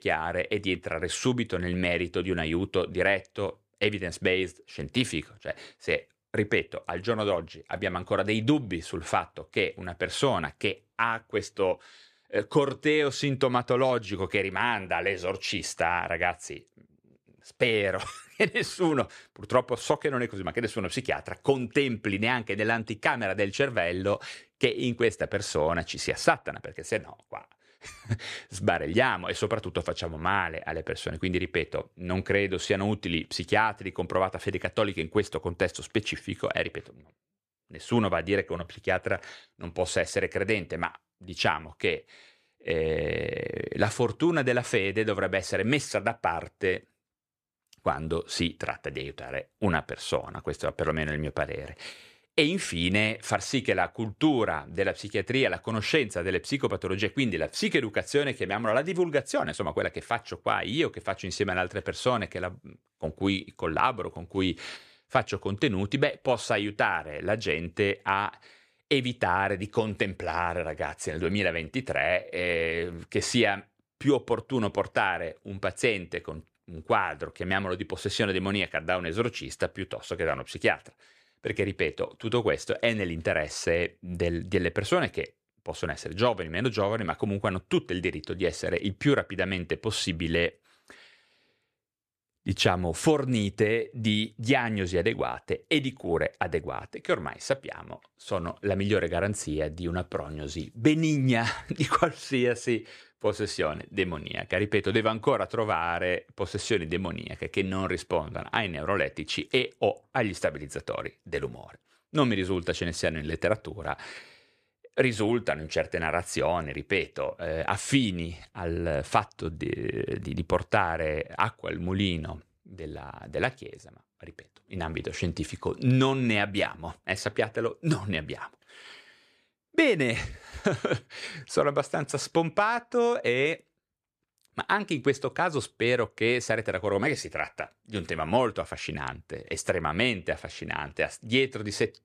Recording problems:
none

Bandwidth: 14.5 kHz